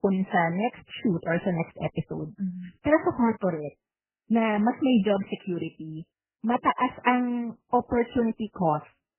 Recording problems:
garbled, watery; badly; nothing above 3 kHz

